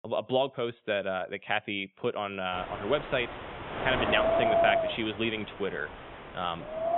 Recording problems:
high frequencies cut off; severe; nothing above 3.5 kHz
wind noise on the microphone; heavy; from 2.5 s on; 2 dB above the speech

